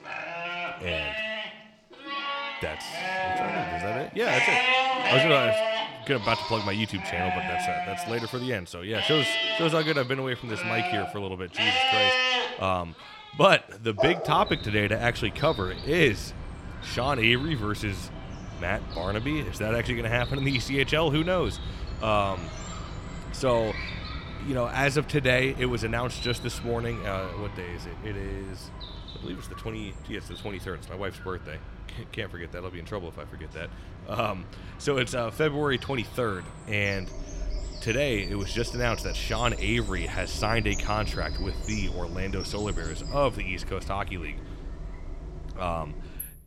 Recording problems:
animal sounds; loud; throughout; 2 dB below the speech

